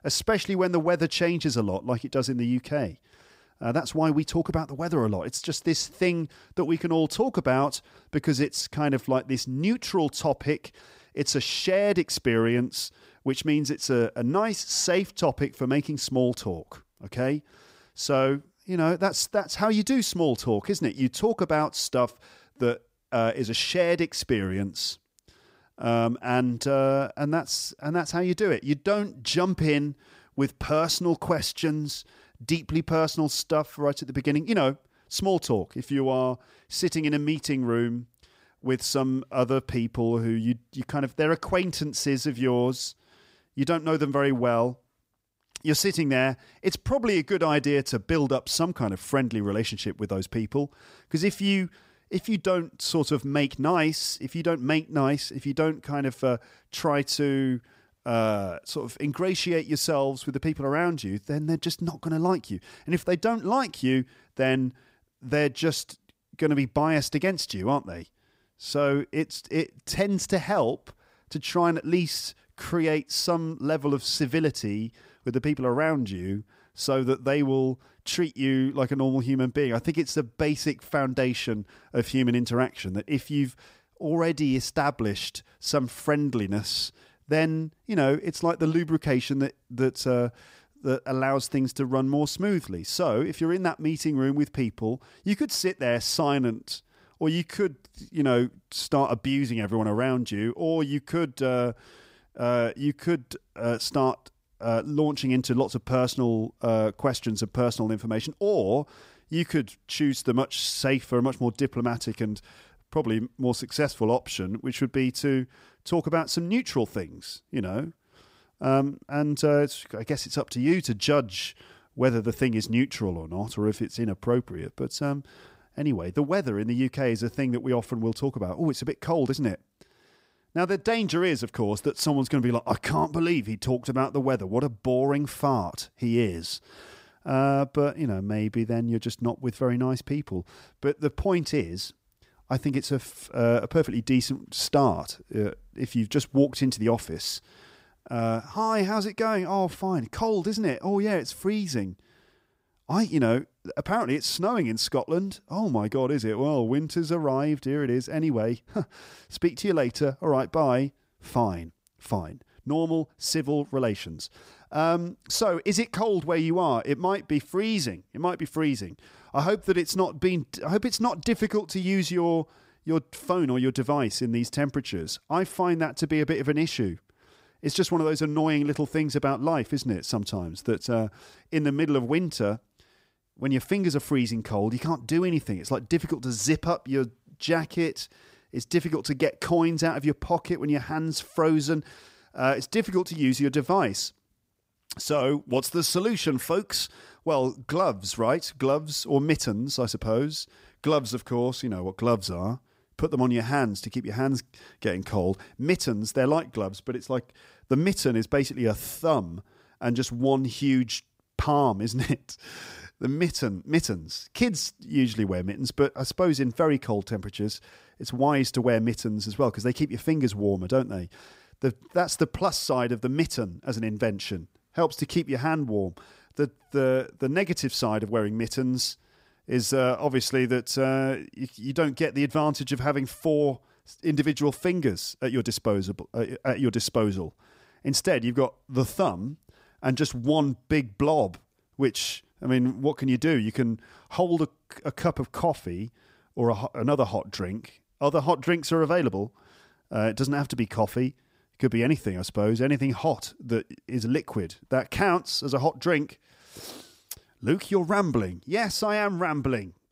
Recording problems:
none

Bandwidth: 15.5 kHz